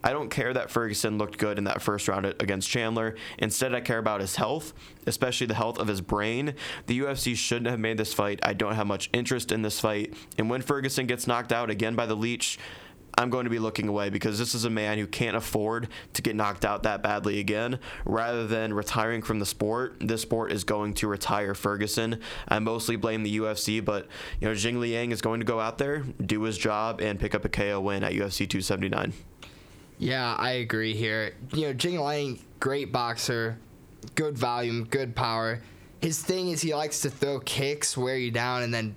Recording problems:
squashed, flat; somewhat

